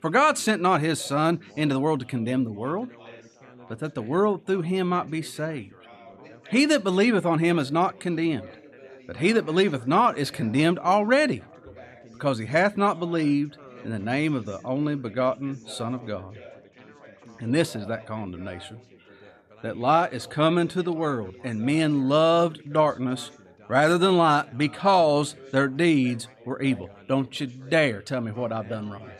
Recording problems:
background chatter; faint; throughout; 4 voices, 25 dB below the speech

